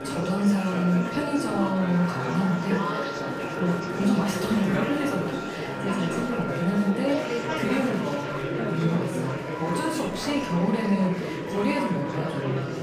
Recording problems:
off-mic speech; far
room echo; noticeable; dies away in 0.5 s
murmuring crowd; loud; throughout; 4 dB below the speech
background music; noticeable; throughout; 10 dB below the speech

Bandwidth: 15 kHz